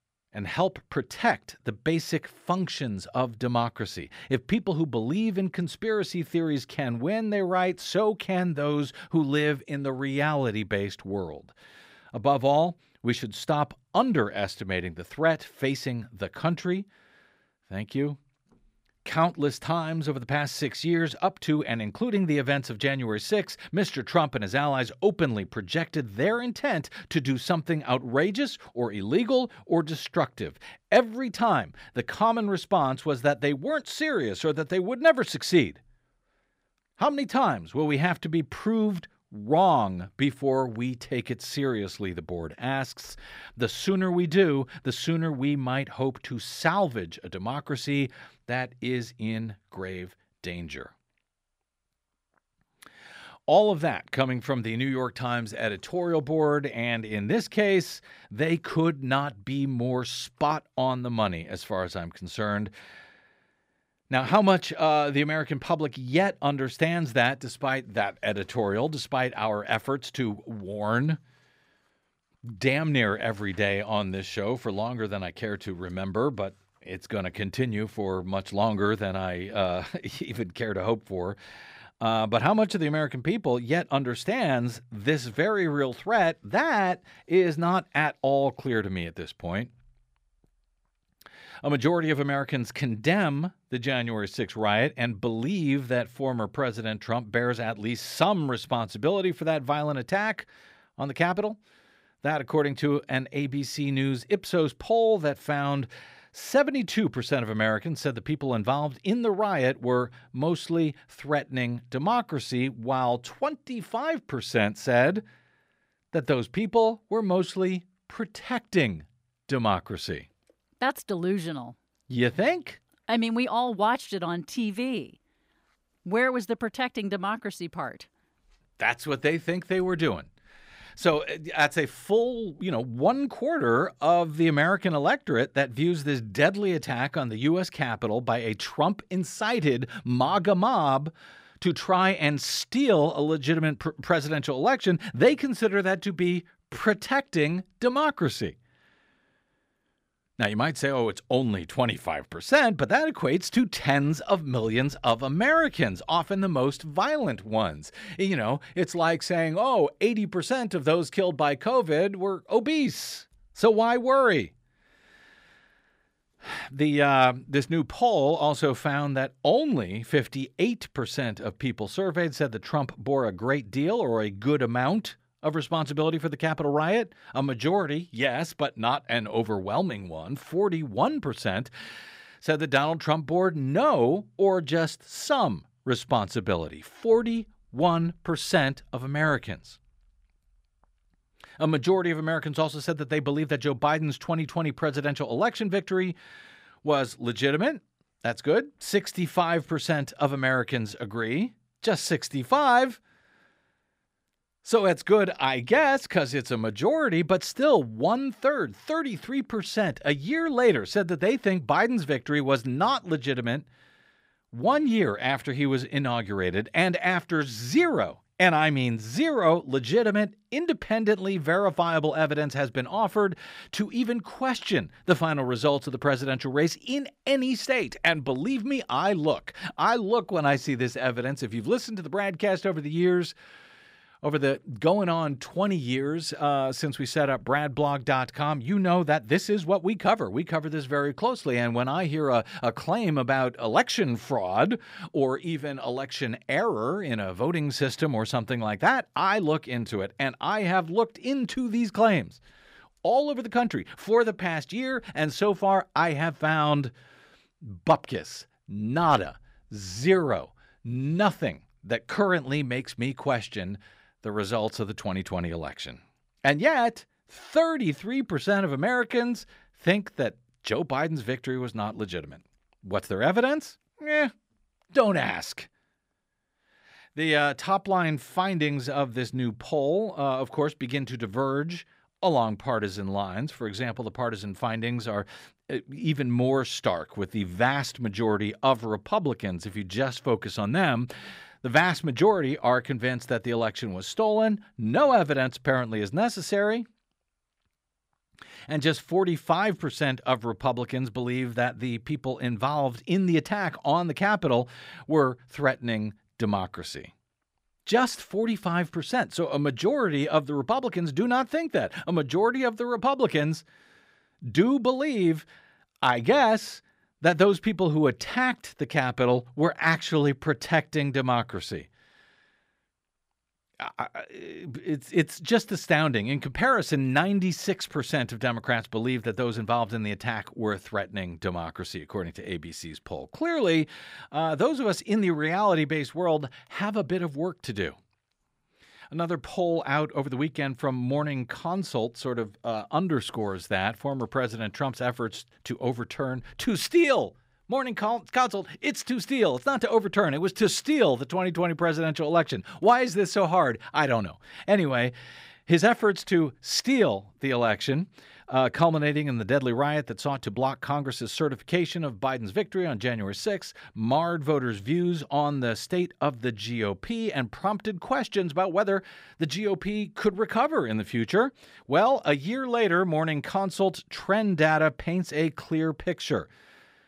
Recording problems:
none

